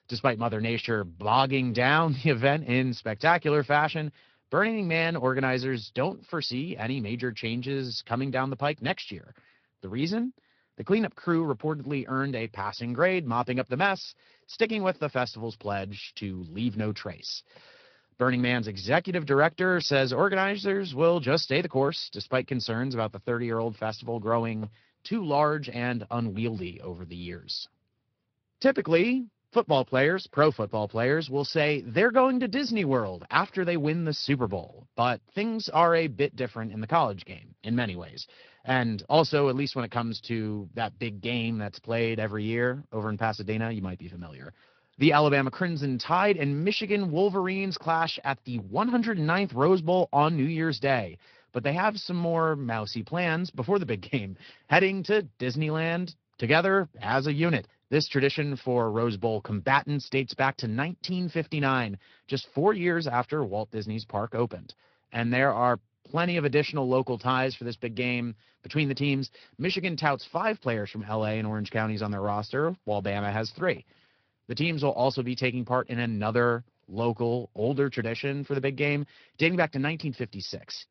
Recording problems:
high frequencies cut off; noticeable; nothing above 5.5 kHz
garbled, watery; slightly

